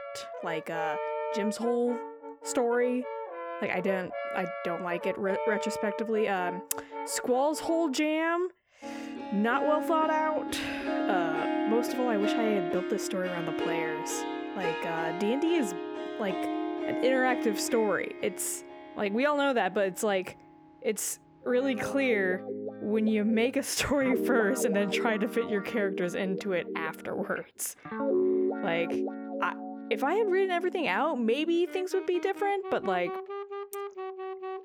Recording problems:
background music; loud; throughout; 5 dB below the speech

